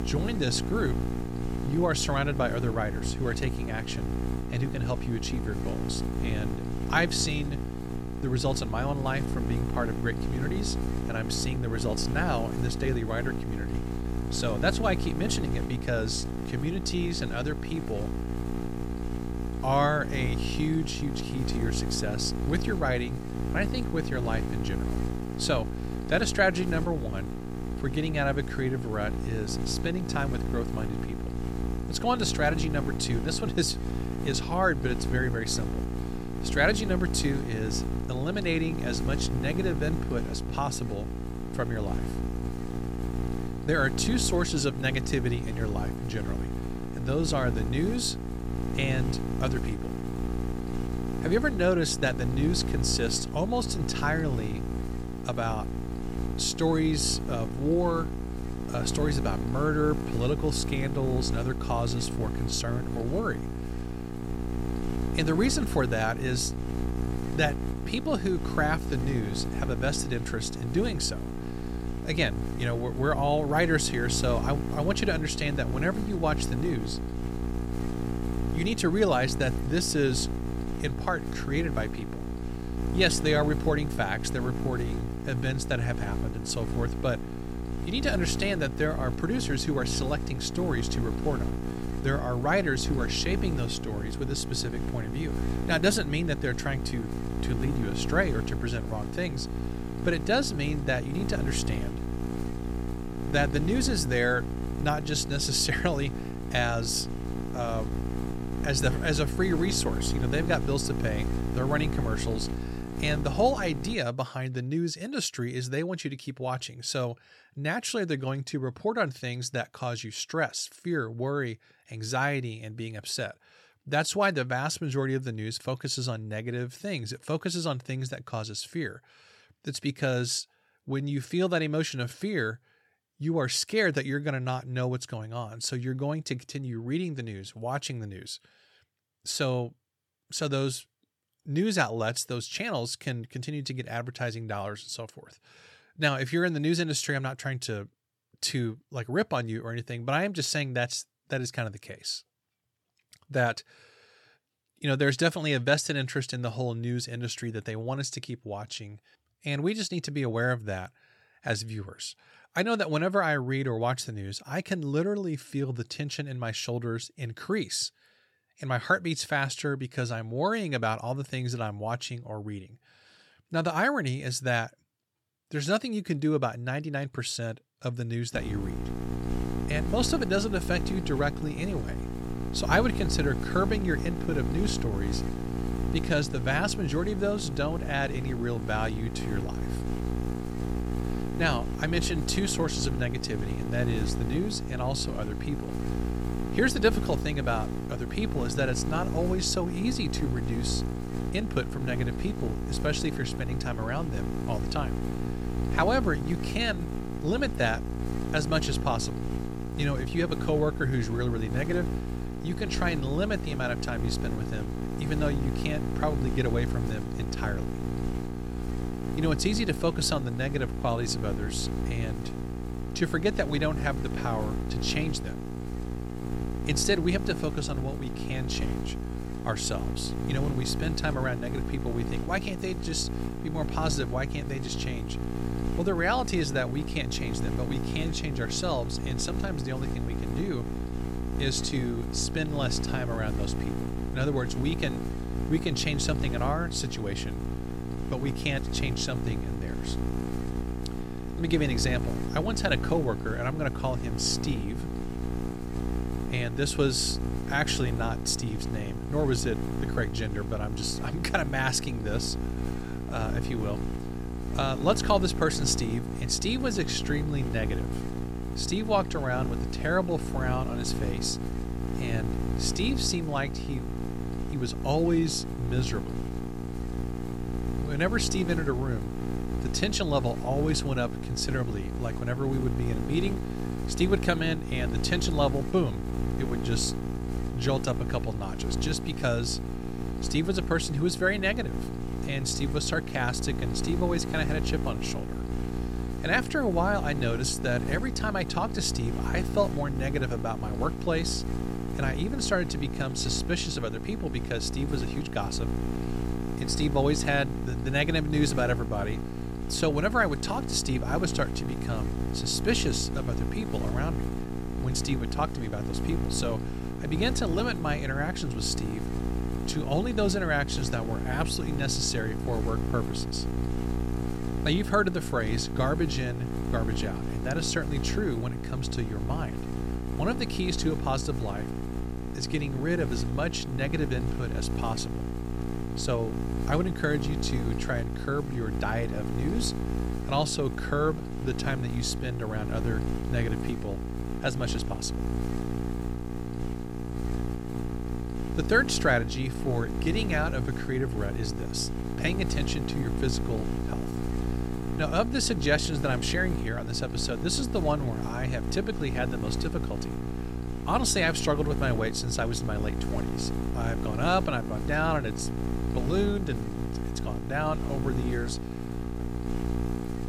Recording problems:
electrical hum; loud; until 1:54 and from 2:58 on; 60 Hz, 8 dB below the speech

